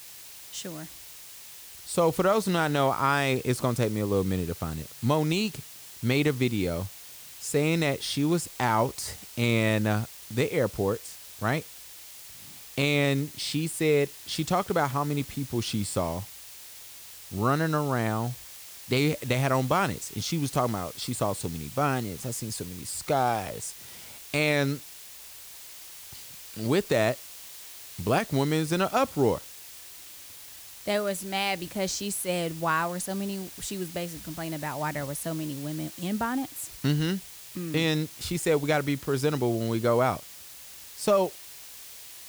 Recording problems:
hiss; noticeable; throughout; 15 dB below the speech

